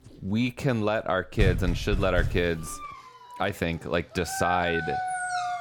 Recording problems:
animal sounds; loud; throughout; 5 dB below the speech
door banging; noticeable; from 1.5 to 2.5 s; peak level with the speech

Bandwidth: 18.5 kHz